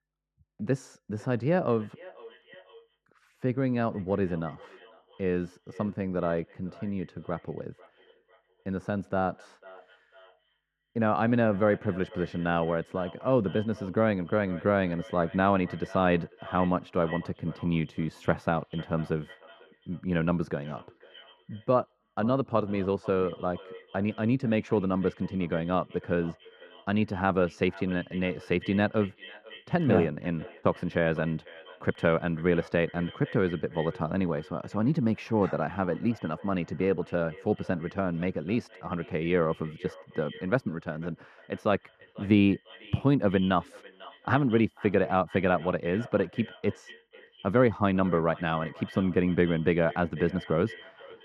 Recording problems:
muffled; very; fading above 2.5 kHz
echo of what is said; faint; throughout; 500 ms later, 20 dB below the speech

